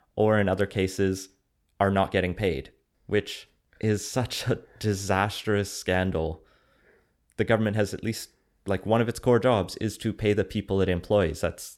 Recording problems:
none

